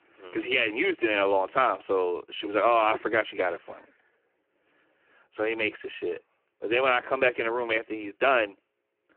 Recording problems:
phone-call audio; poor line

